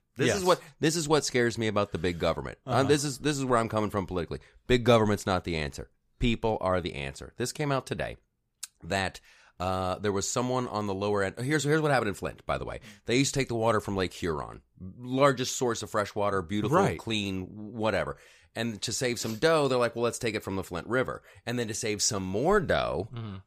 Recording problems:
none

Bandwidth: 15 kHz